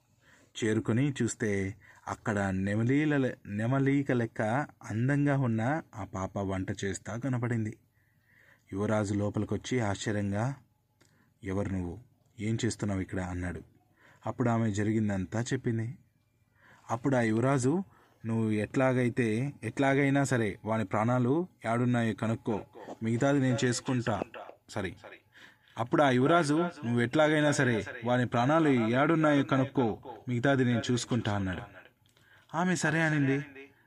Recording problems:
echo of what is said; noticeable; from 22 s on; 280 ms later, 15 dB below the speech

